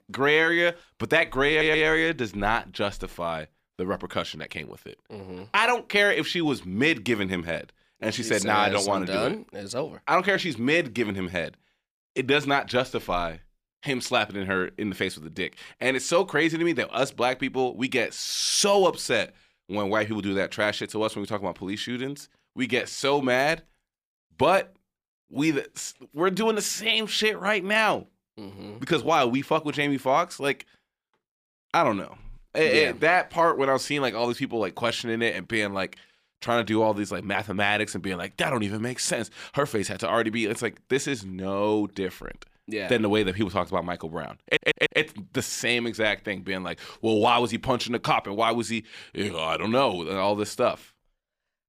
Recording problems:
audio stuttering; at 1.5 s and at 44 s

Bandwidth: 15 kHz